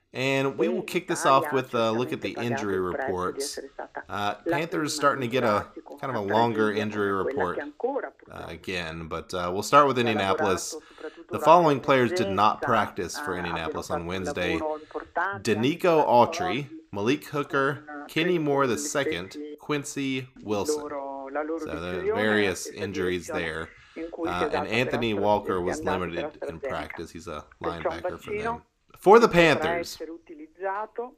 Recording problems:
voice in the background; loud; throughout; 8 dB below the speech

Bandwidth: 15 kHz